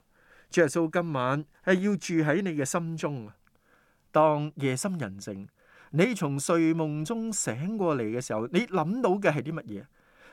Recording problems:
none

